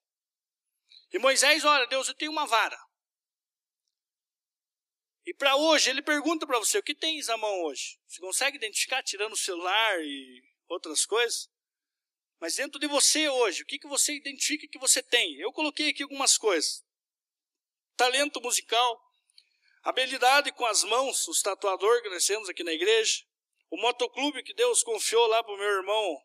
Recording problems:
thin; somewhat; fading below 300 Hz

